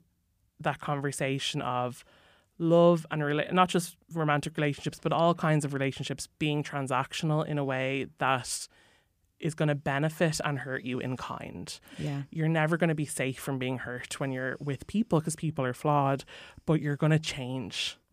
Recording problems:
none

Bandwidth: 15 kHz